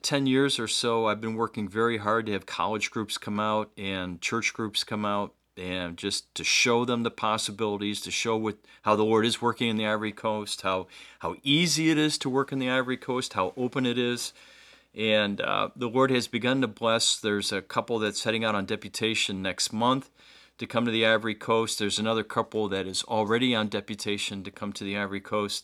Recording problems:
none

